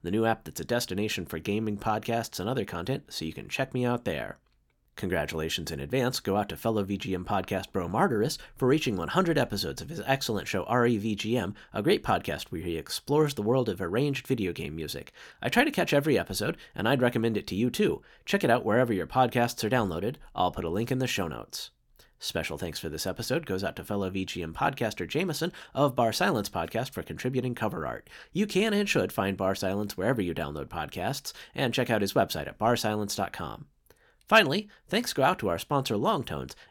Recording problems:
none

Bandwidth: 17 kHz